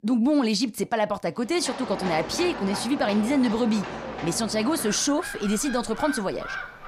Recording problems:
animal sounds; loud; from 1.5 s on; 10 dB below the speech

